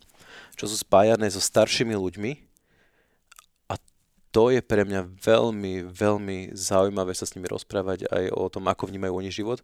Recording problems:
none

